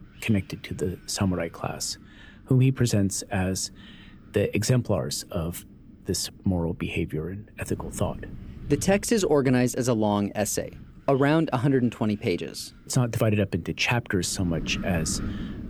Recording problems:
wind noise on the microphone; occasional gusts; 20 dB below the speech

